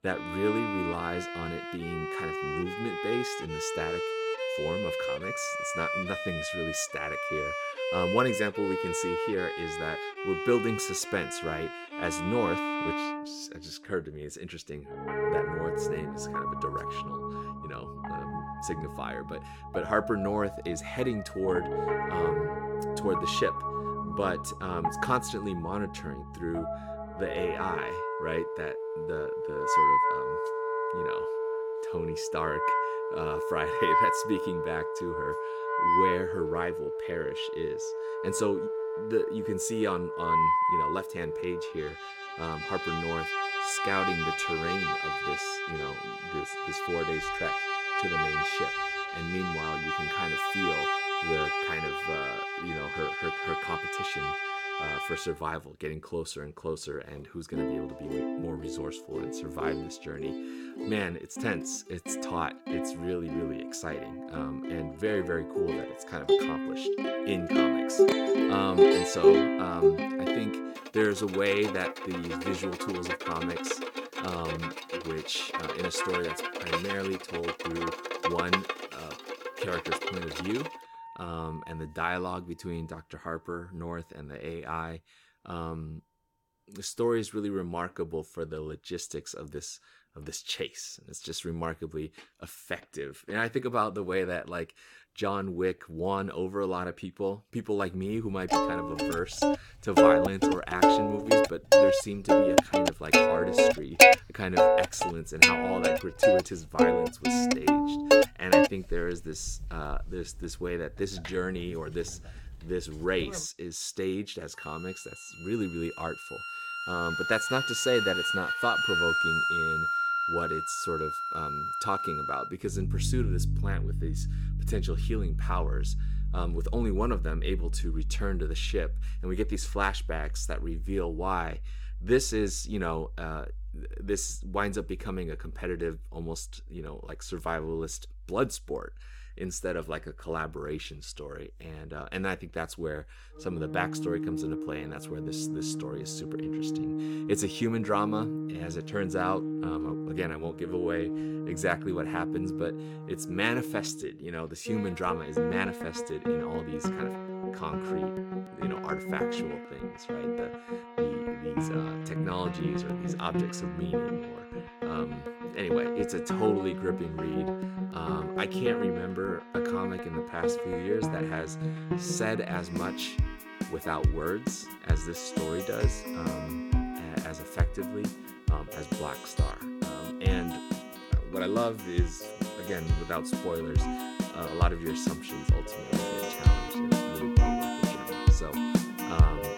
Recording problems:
background music; very loud; throughout; 4 dB above the speech

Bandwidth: 17 kHz